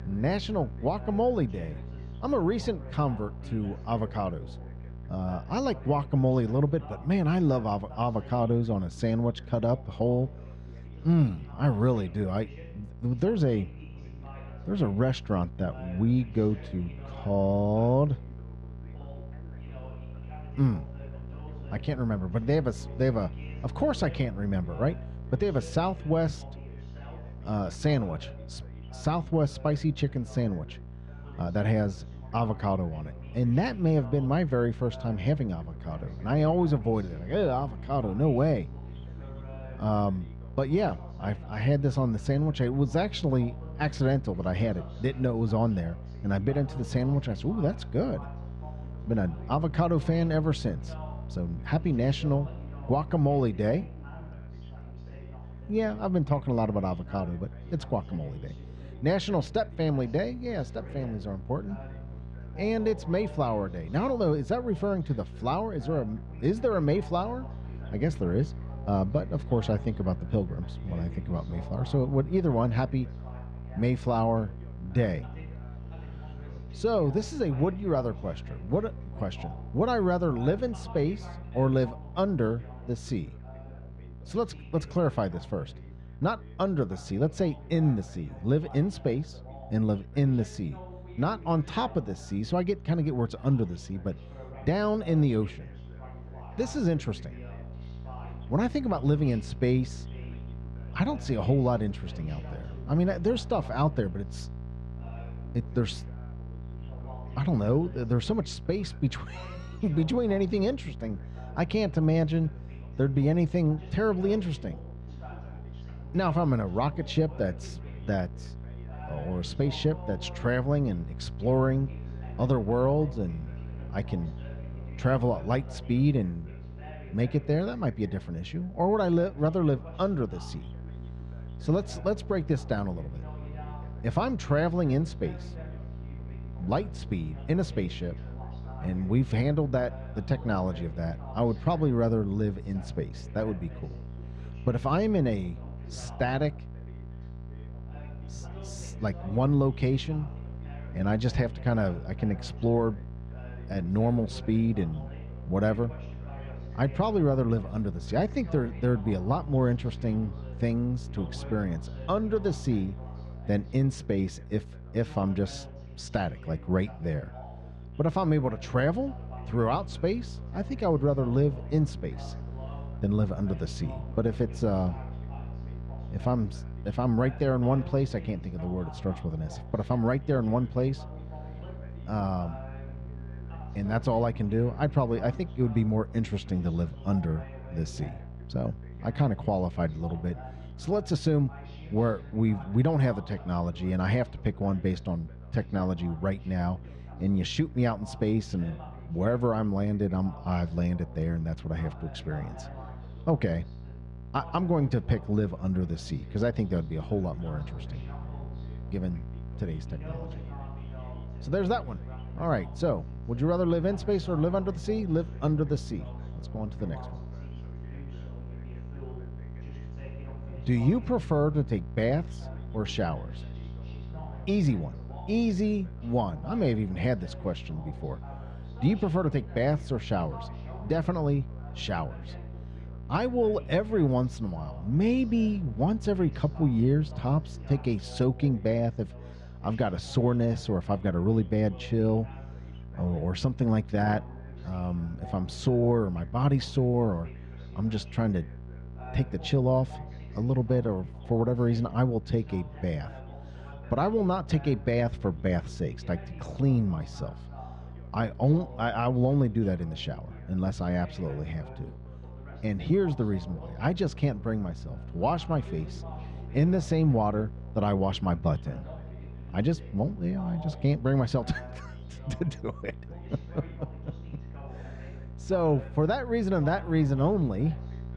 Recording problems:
muffled; slightly; fading above 3 kHz
electrical hum; faint; throughout; 60 Hz, 20 dB below the speech
background chatter; faint; throughout; 2 voices, 20 dB below the speech

